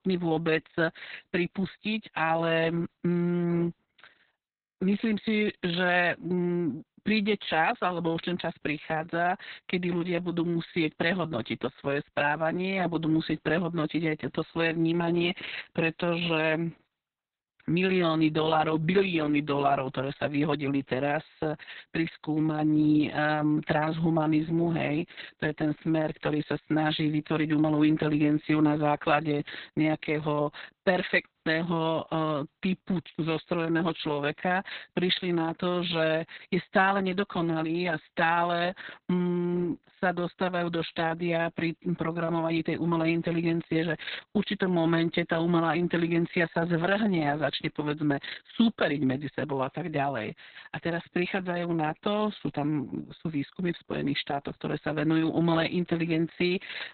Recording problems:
garbled, watery; badly; nothing above 4 kHz

